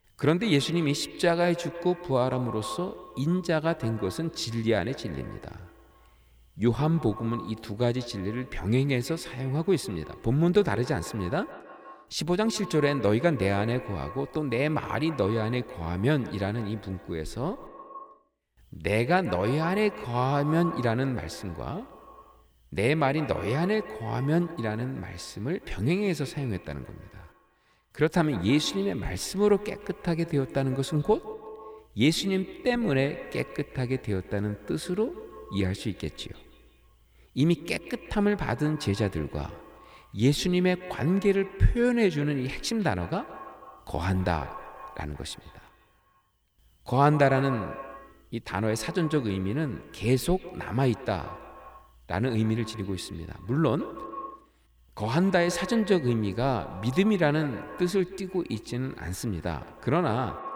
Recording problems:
echo of what is said; noticeable; throughout; 150 ms later, 15 dB below the speech

